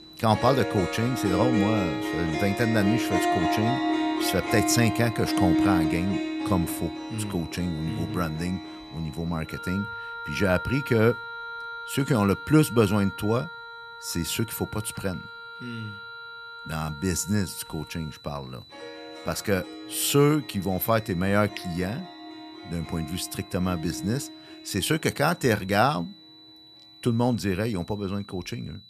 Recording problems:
background music; loud; throughout; 5 dB below the speech
high-pitched whine; faint; throughout; 4 kHz, 20 dB below the speech

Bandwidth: 14.5 kHz